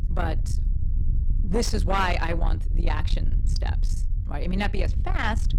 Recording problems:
distortion; slight; 10 dB below the speech
low rumble; noticeable; throughout; 10 dB below the speech

